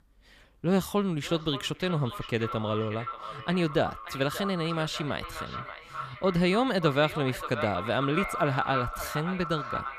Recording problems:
echo of what is said; strong; throughout; 580 ms later, 8 dB below the speech

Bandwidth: 15 kHz